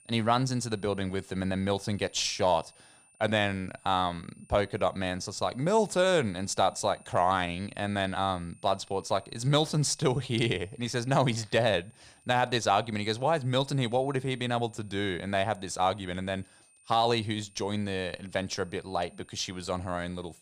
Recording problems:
high-pitched whine; faint; throughout; 9 kHz, 30 dB below the speech

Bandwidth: 15 kHz